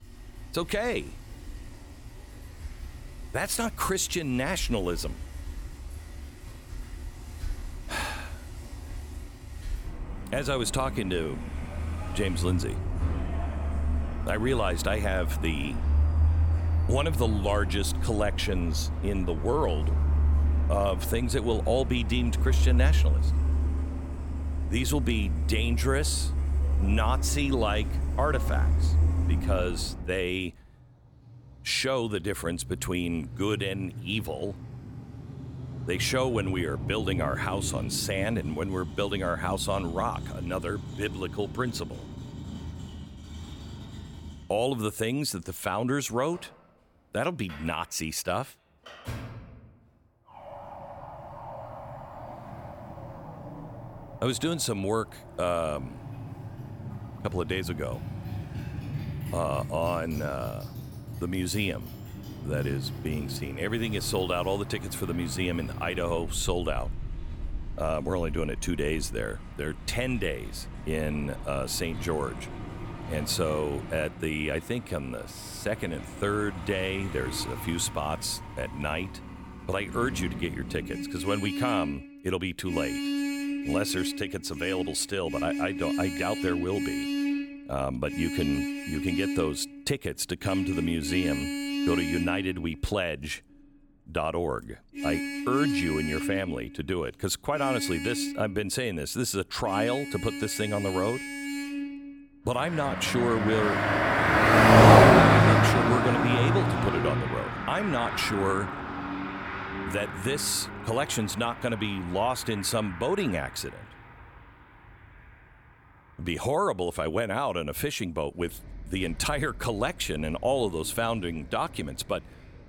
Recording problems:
traffic noise; very loud; throughout; 1 dB above the speech

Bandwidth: 17.5 kHz